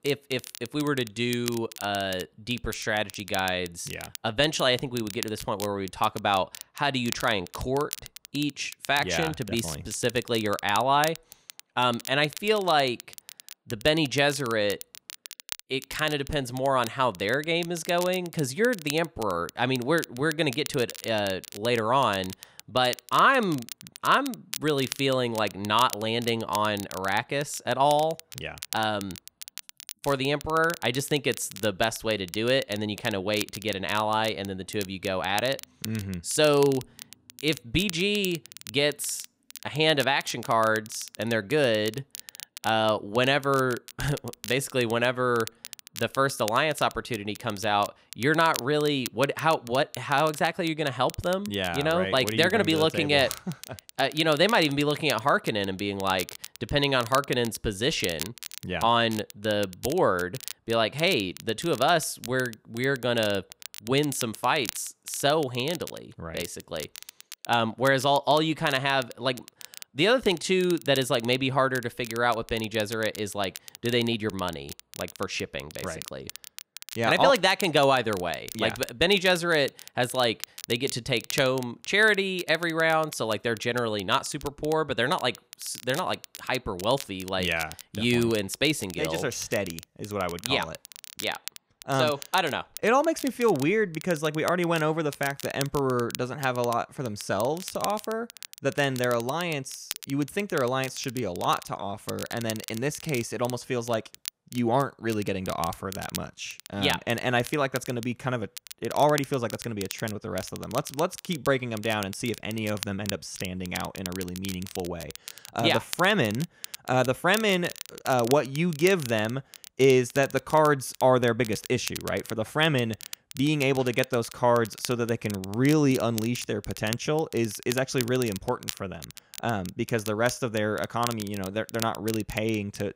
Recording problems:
crackle, like an old record; noticeable; 15 dB below the speech

